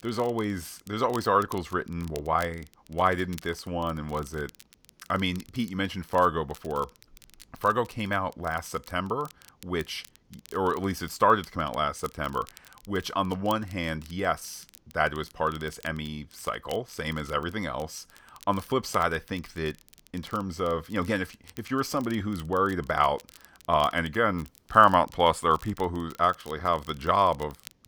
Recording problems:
crackle, like an old record; faint; 25 dB below the speech

